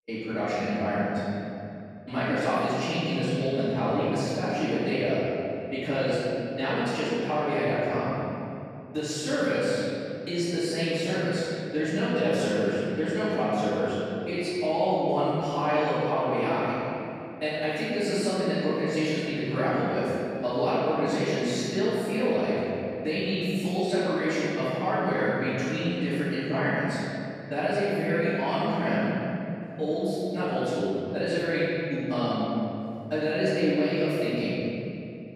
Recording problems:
room echo; strong; dies away in 2.7 s
off-mic speech; far

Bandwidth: 15 kHz